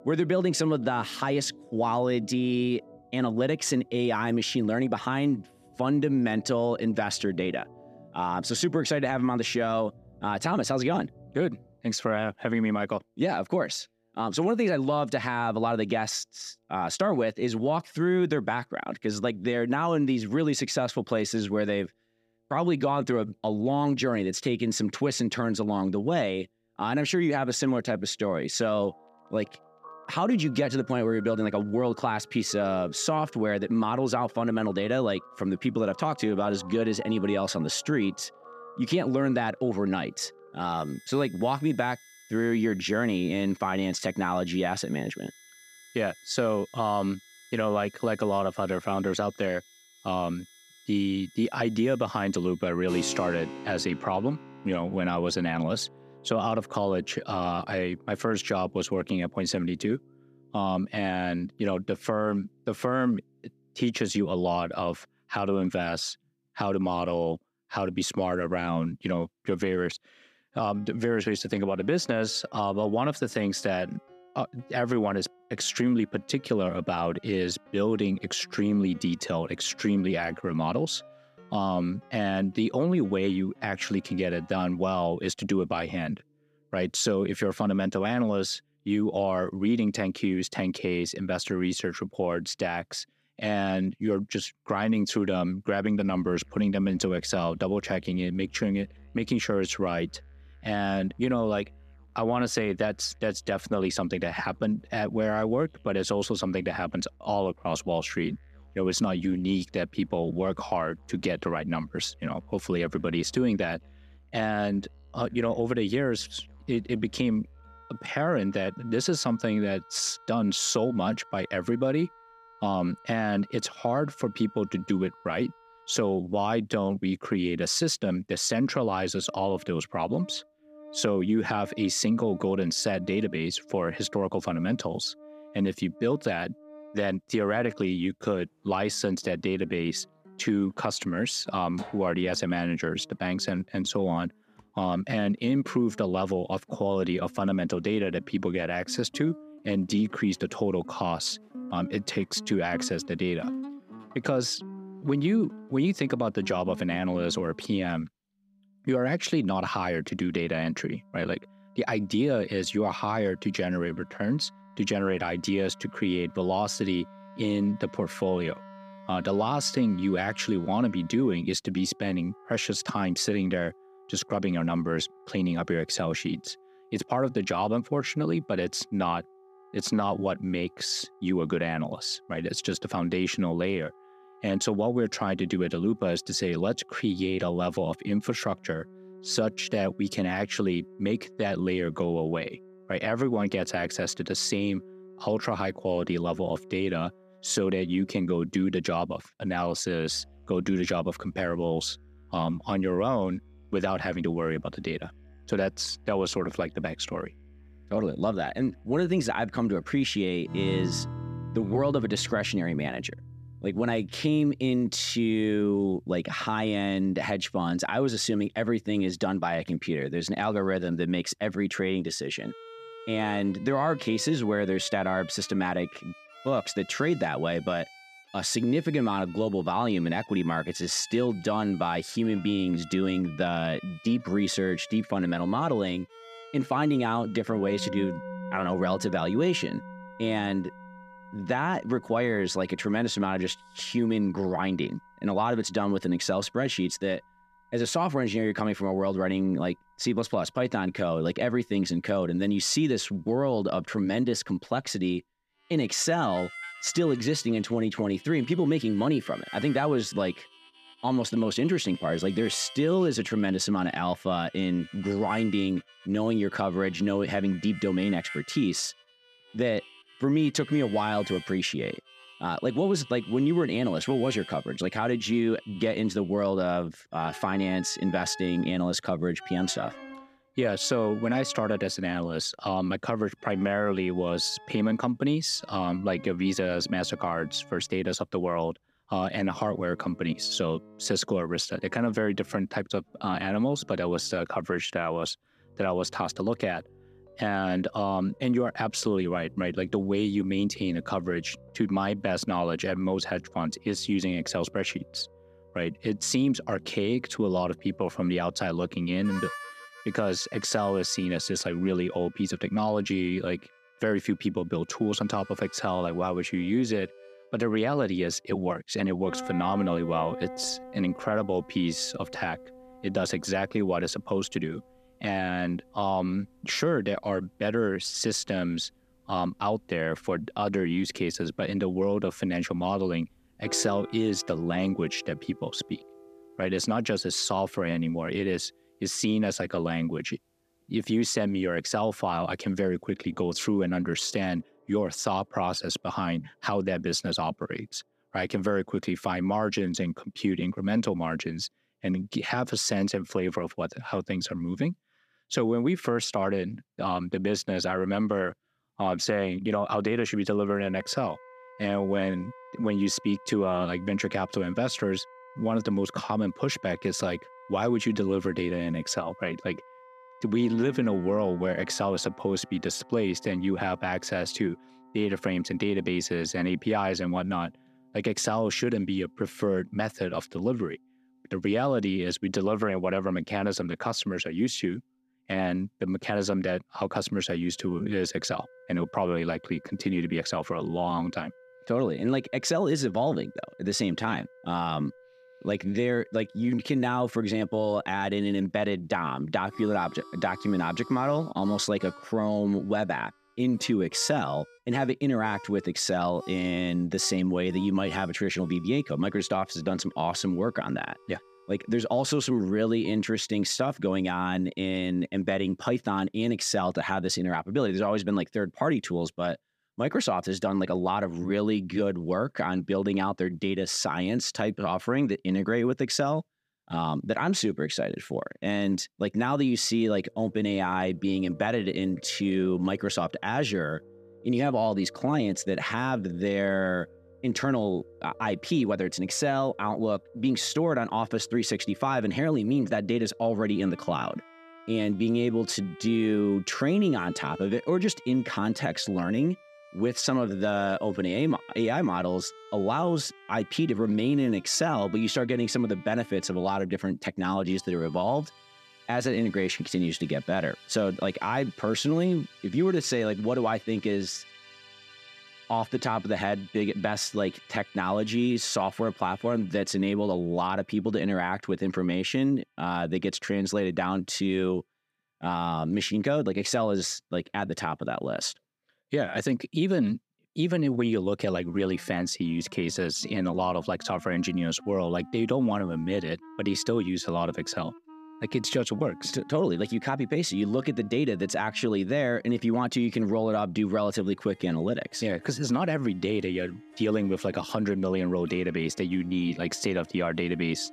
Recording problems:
background music; noticeable; throughout; 20 dB below the speech

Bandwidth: 14.5 kHz